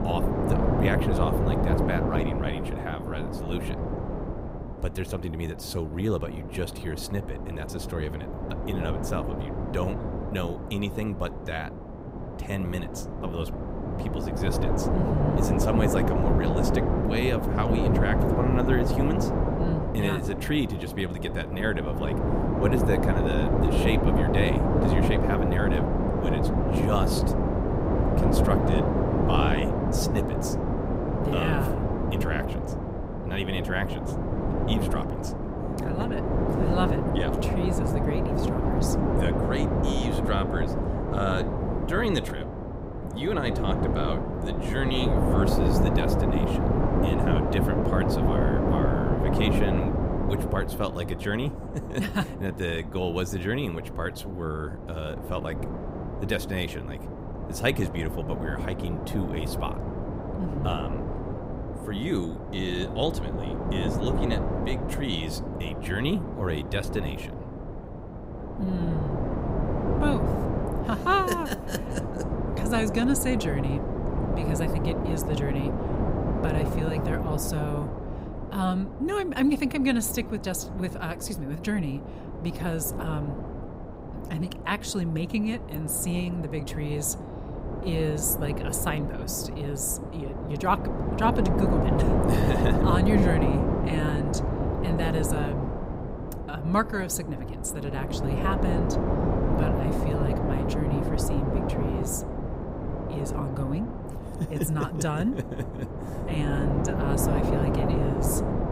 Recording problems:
wind noise on the microphone; heavy; as loud as the speech

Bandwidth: 15.5 kHz